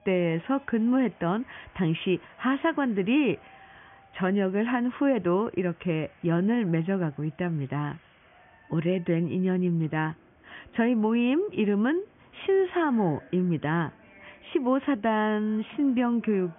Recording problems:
high frequencies cut off; severe; nothing above 3.5 kHz
crowd noise; faint; throughout; 30 dB below the speech

